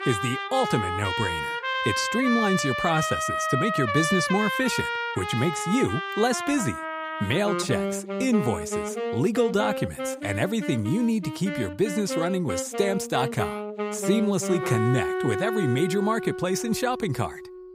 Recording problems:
background music; loud; throughout; 3 dB below the speech

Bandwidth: 15.5 kHz